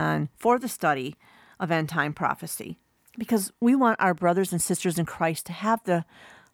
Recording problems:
abrupt cut into speech; at the start

